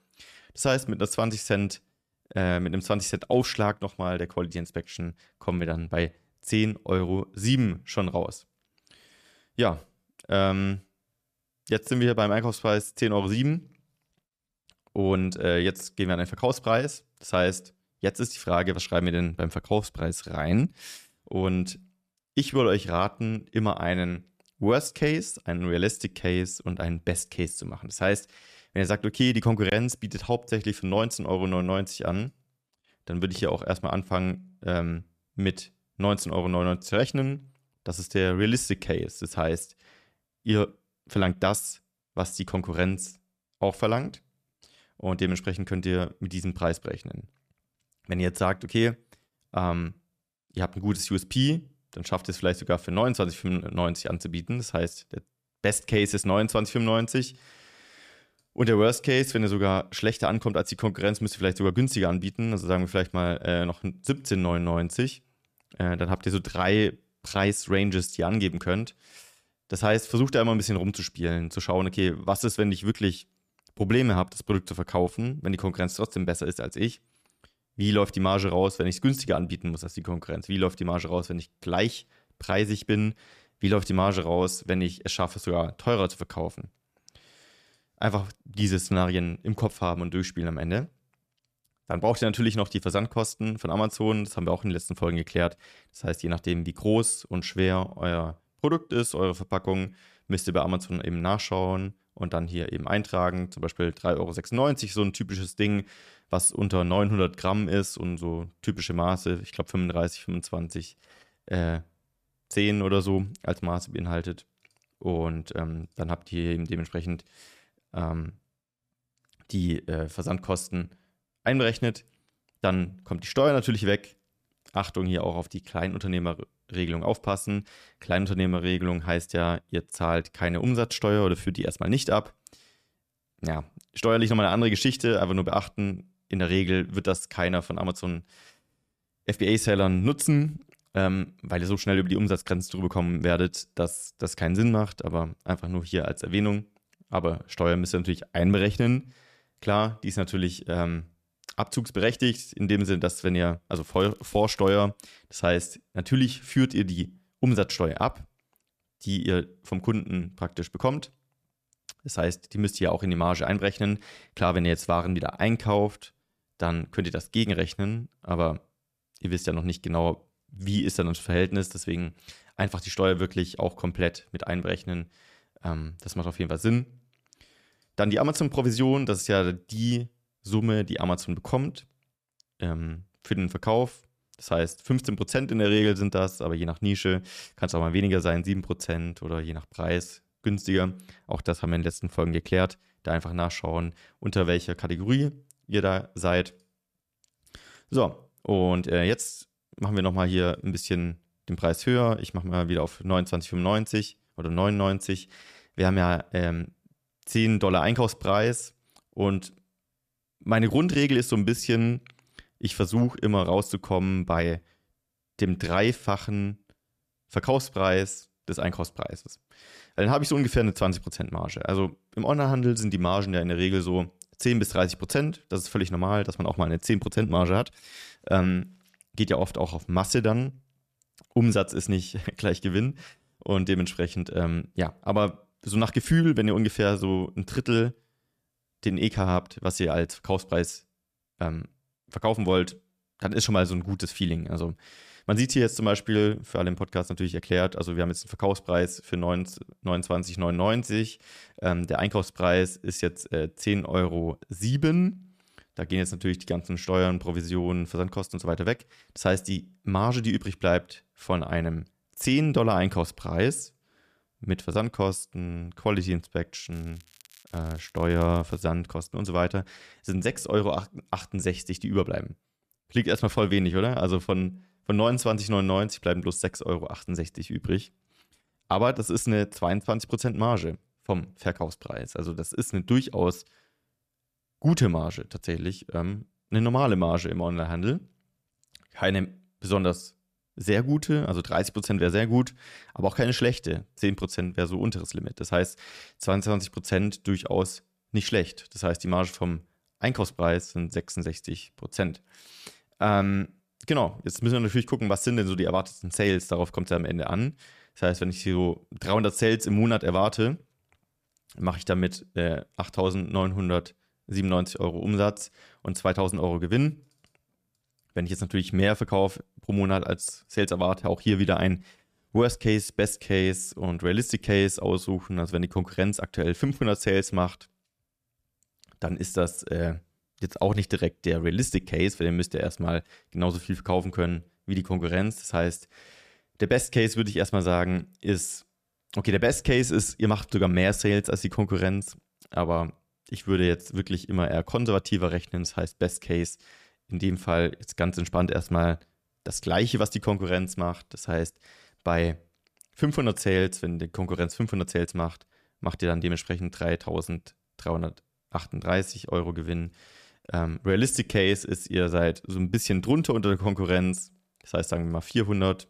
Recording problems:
crackling; faint; at 2:34 and from 4:27 to 4:29; 25 dB below the speech

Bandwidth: 14.5 kHz